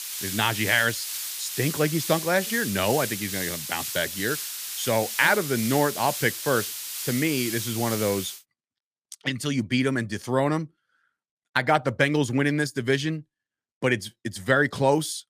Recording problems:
hiss; loud; until 8.5 s; 5 dB below the speech

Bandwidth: 15 kHz